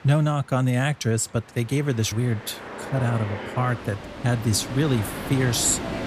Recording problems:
train or aircraft noise; loud; throughout; 10 dB below the speech

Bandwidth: 15 kHz